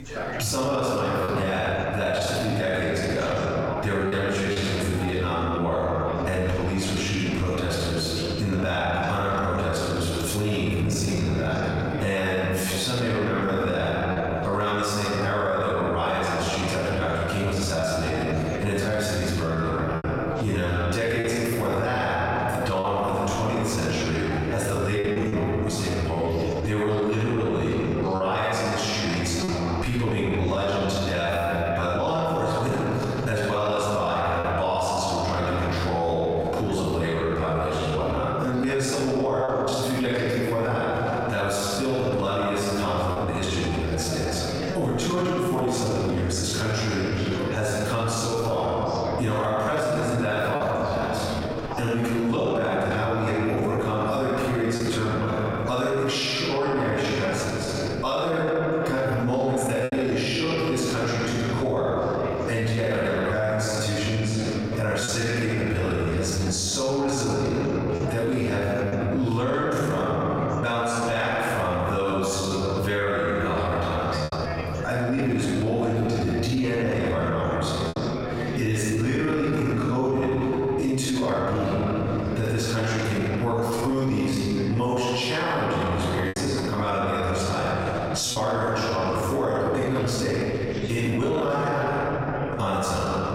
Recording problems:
room echo; strong; dies away in 2 s
off-mic speech; far
squashed, flat; heavily, background pumping
background chatter; noticeable; throughout; 3 voices, 15 dB below the speech
choppy; occasionally; 1% of the speech affected

